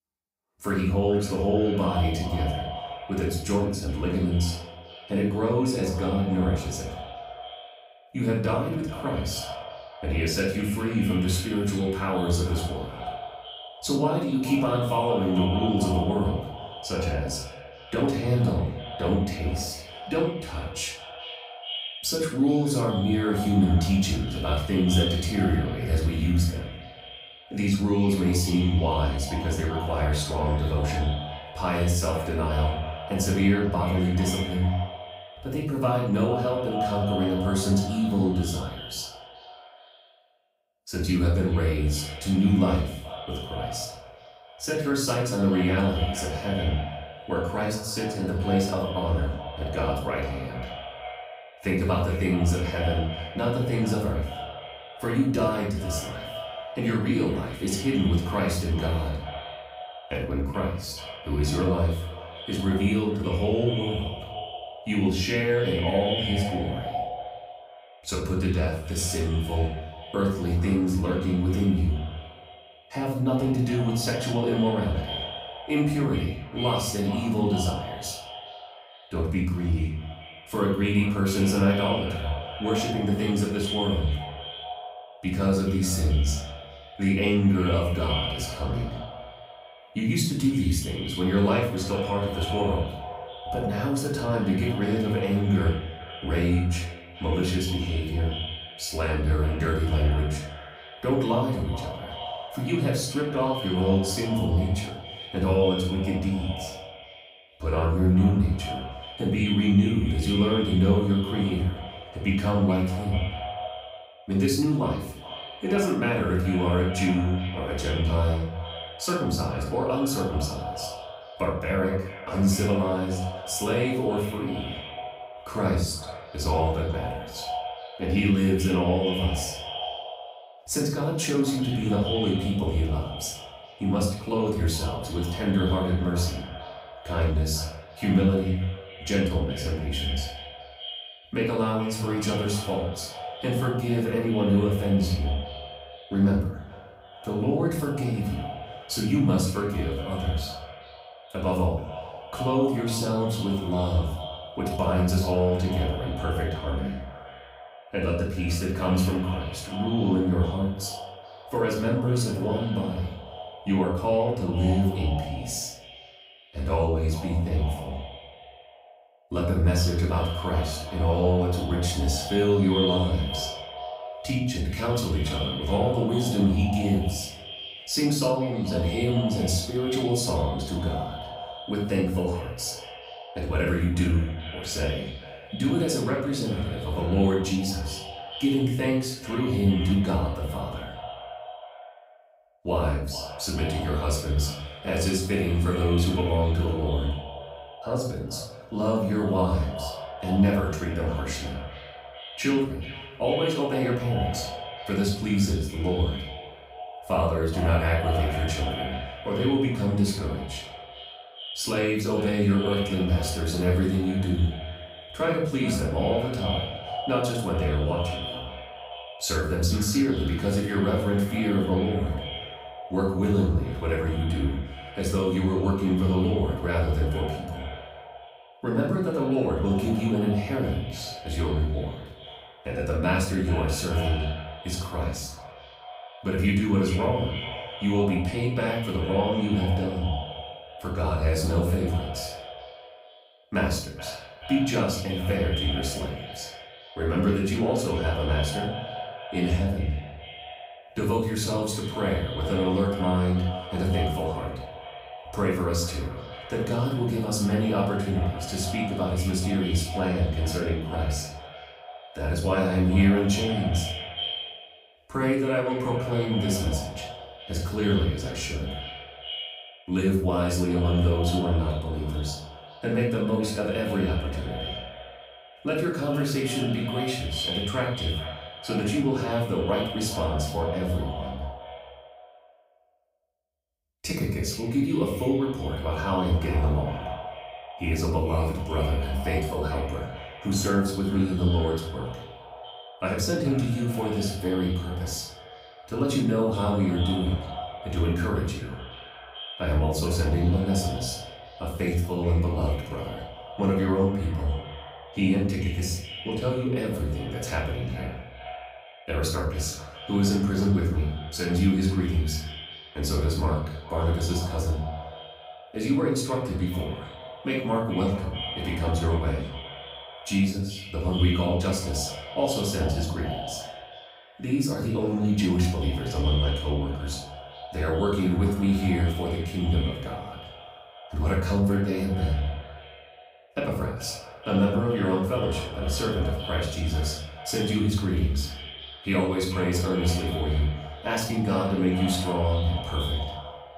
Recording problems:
echo of what is said; strong; throughout; 430 ms later, 10 dB below the speech
off-mic speech; far
room echo; noticeable; dies away in 0.5 s

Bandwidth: 15.5 kHz